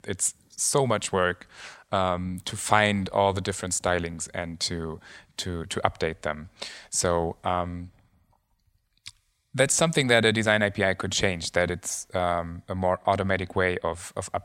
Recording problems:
none

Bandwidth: 16 kHz